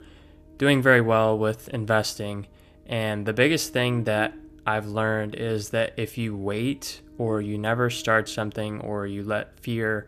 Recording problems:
electrical hum; faint; throughout; 50 Hz, 25 dB below the speech

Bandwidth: 14.5 kHz